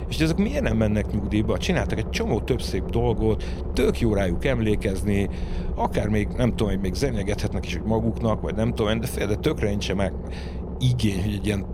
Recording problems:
low rumble; noticeable; throughout; 10 dB below the speech

